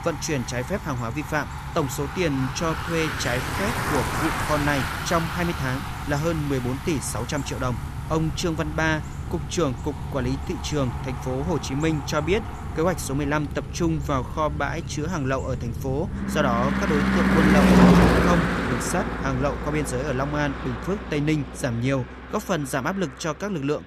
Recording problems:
traffic noise; very loud; throughout; as loud as the speech

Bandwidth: 14.5 kHz